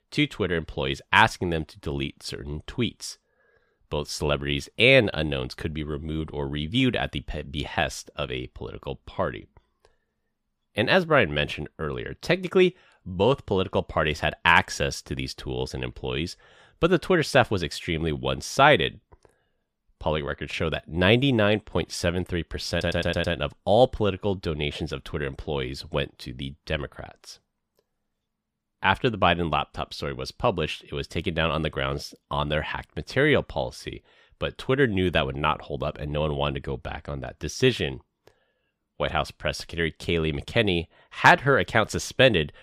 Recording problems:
audio stuttering; at 23 s

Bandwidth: 15 kHz